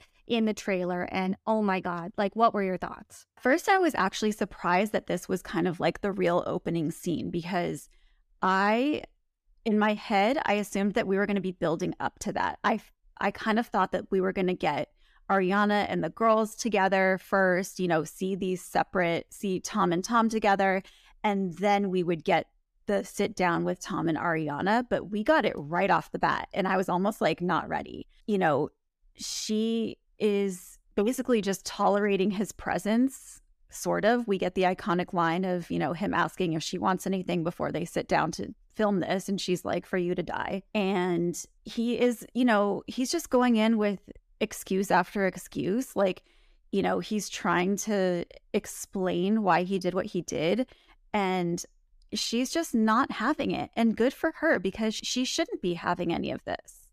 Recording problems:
none

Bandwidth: 14.5 kHz